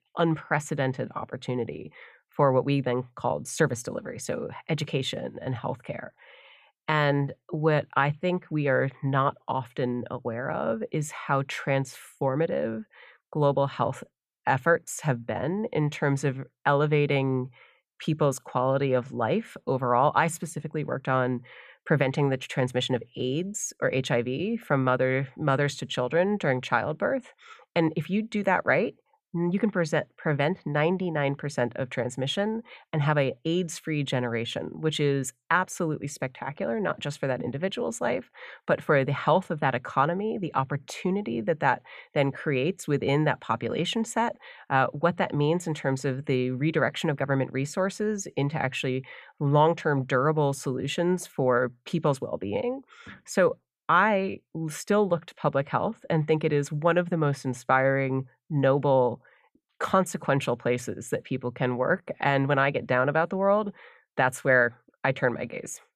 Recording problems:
none

